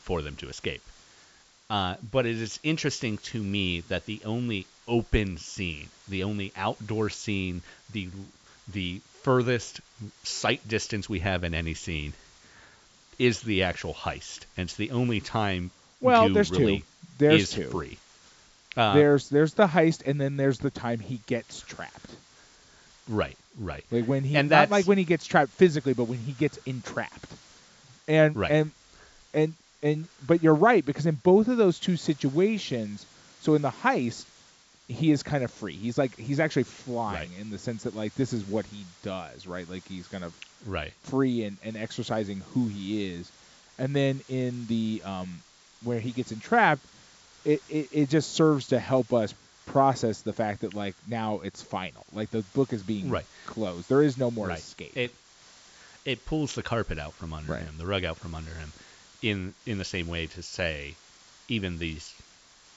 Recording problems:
high frequencies cut off; noticeable; nothing above 8 kHz
hiss; faint; throughout; 25 dB below the speech

